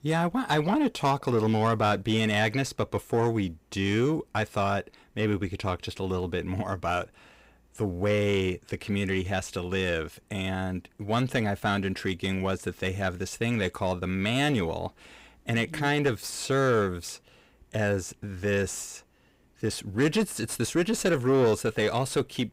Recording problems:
distortion; slight; 10 dB below the speech

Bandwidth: 15.5 kHz